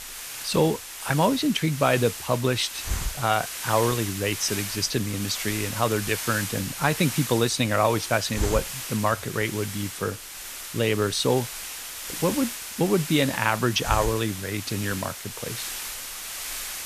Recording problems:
hiss; loud; throughout; 7 dB below the speech

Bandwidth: 14.5 kHz